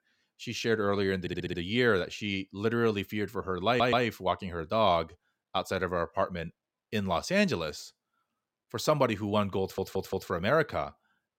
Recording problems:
audio stuttering; at 1 s, at 3.5 s and at 9.5 s

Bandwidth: 16.5 kHz